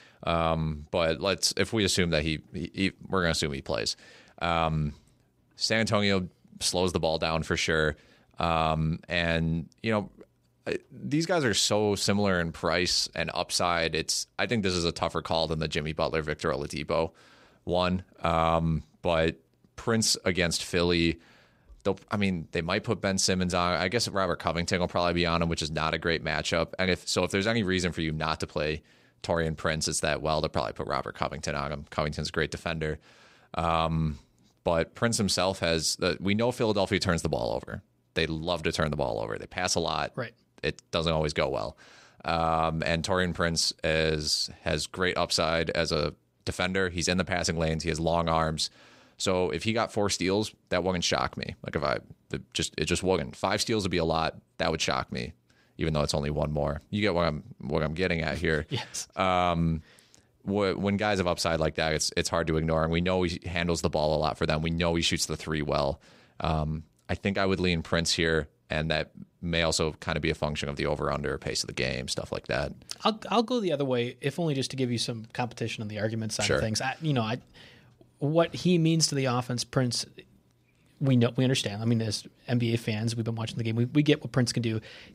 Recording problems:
none

